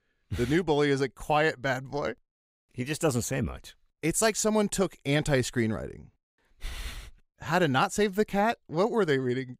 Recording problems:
none

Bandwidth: 15.5 kHz